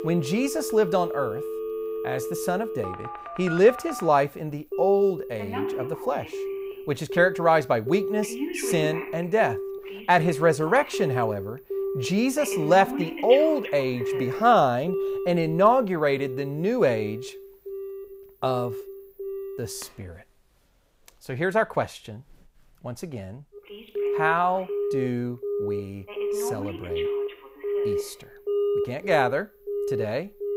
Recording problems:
alarms or sirens; loud; throughout; 7 dB below the speech

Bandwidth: 15.5 kHz